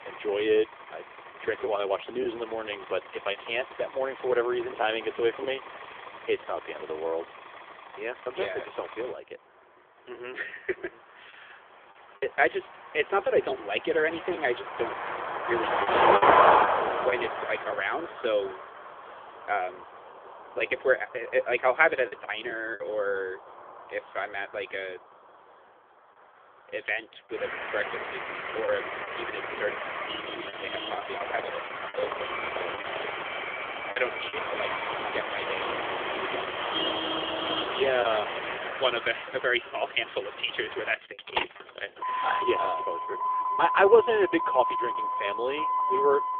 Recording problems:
phone-call audio; nothing above 3.5 kHz
traffic noise; very loud; throughout; as loud as the speech
choppy; occasionally; 3% of the speech affected
alarm; noticeable; from 32 to 36 s; peak 6 dB below the speech

